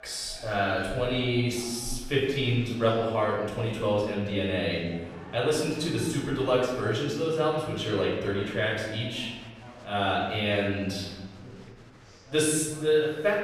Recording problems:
off-mic speech; far
room echo; noticeable; dies away in 1.1 s
murmuring crowd; faint; throughout; 20 dB below the speech

